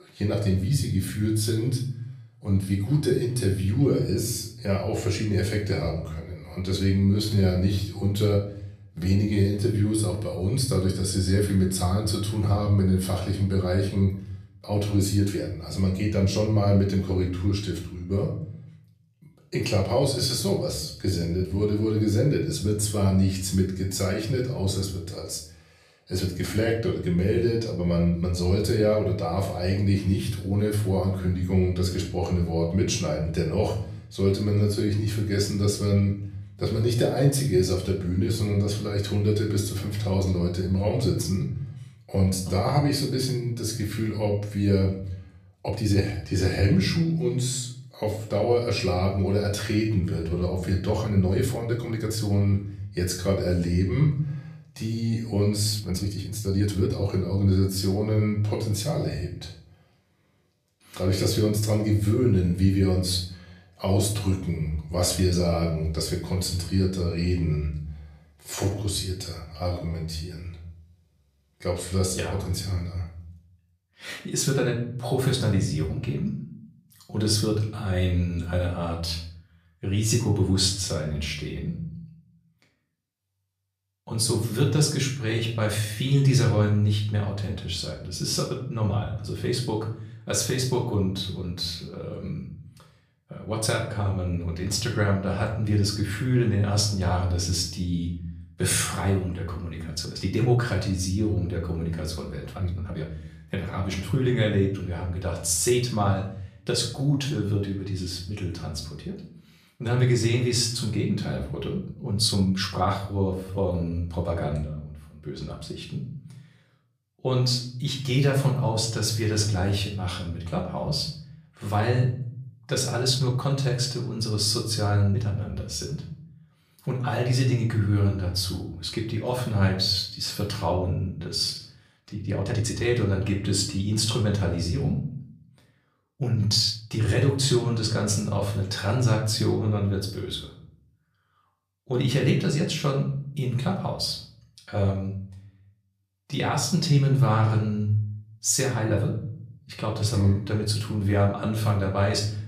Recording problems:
off-mic speech; far
room echo; slight; dies away in 0.6 s
uneven, jittery; strongly; from 7 s to 2:31

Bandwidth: 14.5 kHz